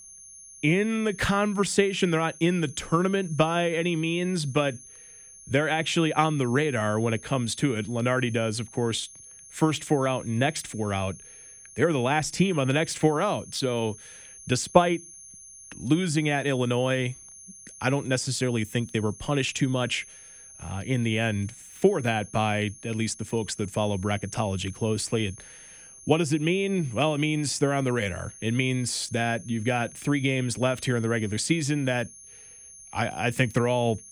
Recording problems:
high-pitched whine; noticeable; throughout; 6.5 kHz, 20 dB below the speech

